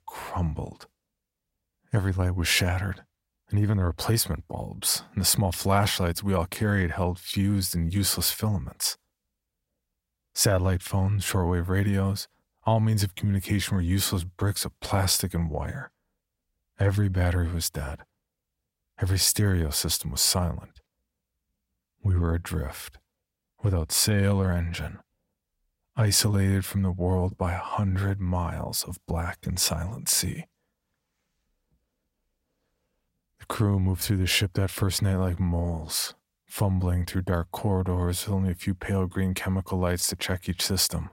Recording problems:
none

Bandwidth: 16 kHz